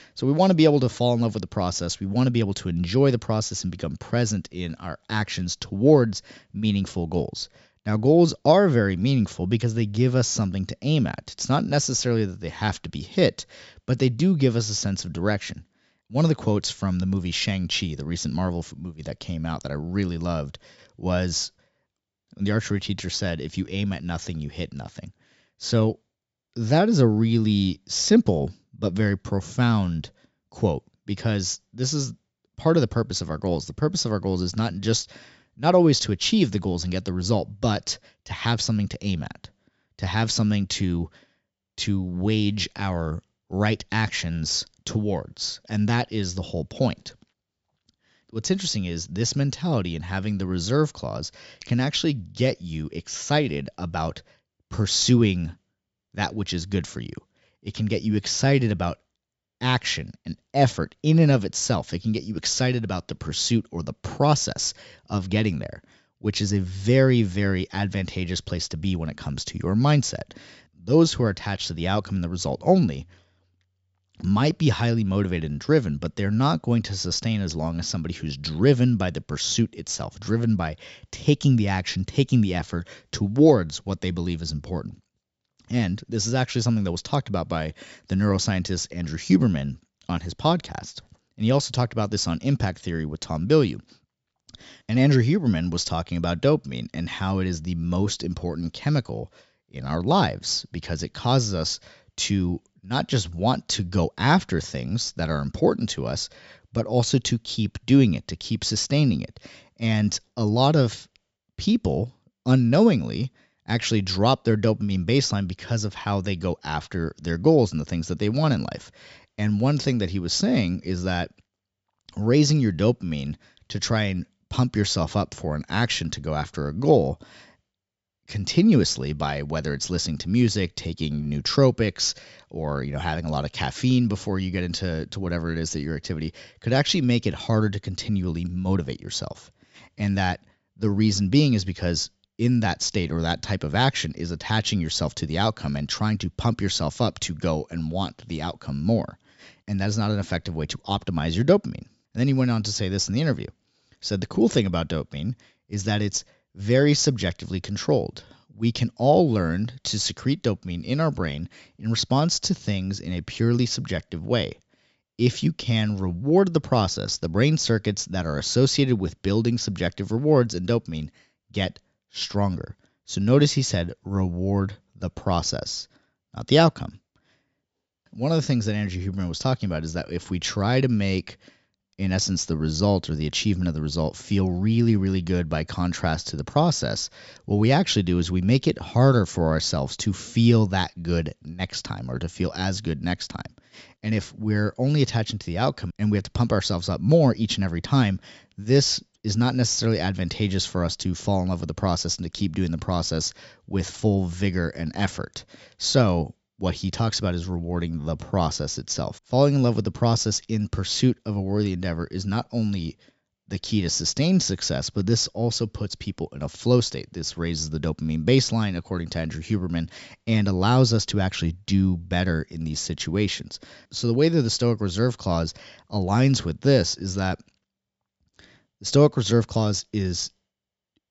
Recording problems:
high frequencies cut off; noticeable; nothing above 8 kHz

